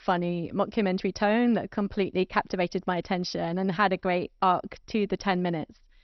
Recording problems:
garbled, watery; slightly; nothing above 6 kHz

